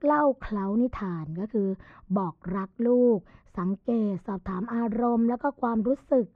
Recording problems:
muffled; very; fading above 1.5 kHz

